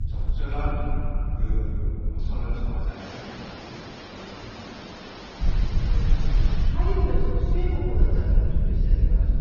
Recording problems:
room echo; strong; dies away in 2.7 s
off-mic speech; far
garbled, watery; slightly; nothing above 6 kHz
hiss; loud; from 3 to 6.5 s; 4 dB below the speech
low rumble; loud; until 3 s and from 5.5 s on; 6 dB below the speech

